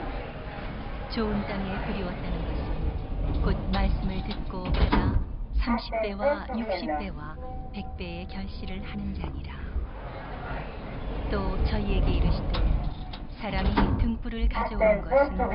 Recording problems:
high frequencies cut off; noticeable; nothing above 5.5 kHz
household noises; very loud; throughout; 5 dB above the speech

